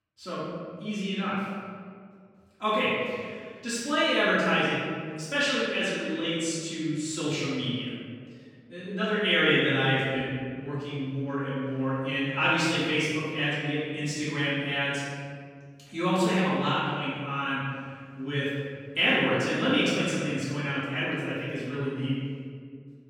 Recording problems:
room echo; strong; dies away in 1.8 s
off-mic speech; far

